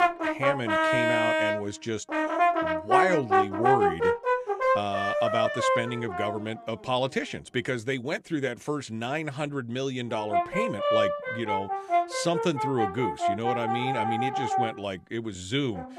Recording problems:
background music; very loud; throughout; 4 dB above the speech

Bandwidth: 13.5 kHz